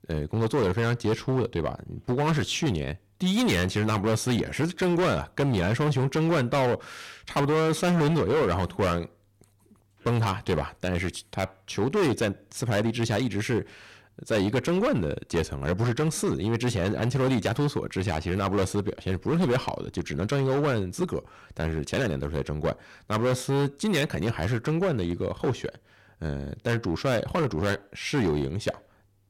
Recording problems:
distortion; heavy; 14% of the sound clipped

